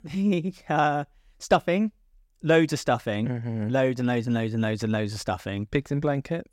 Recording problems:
none

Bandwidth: 16 kHz